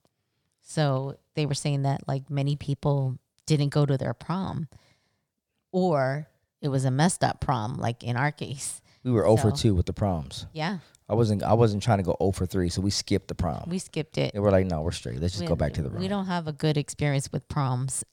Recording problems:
none

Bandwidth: 18.5 kHz